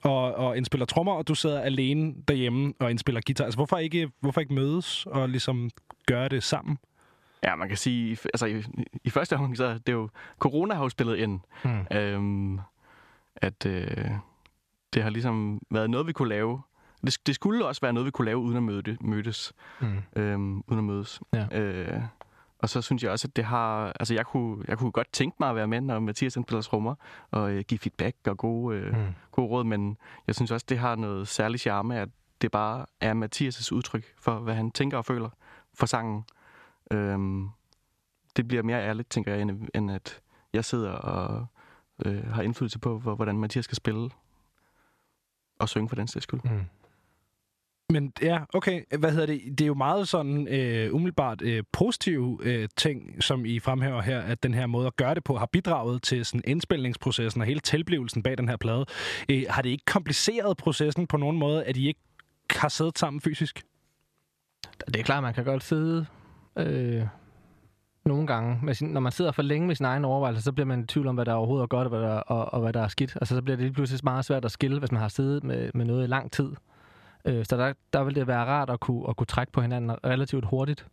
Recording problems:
squashed, flat; somewhat

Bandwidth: 14 kHz